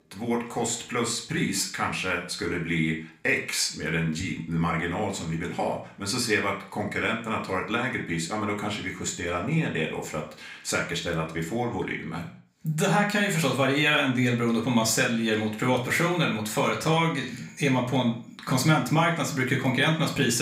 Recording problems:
room echo; slight; dies away in 0.4 s
off-mic speech; somewhat distant
abrupt cut into speech; at the end

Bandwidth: 15.5 kHz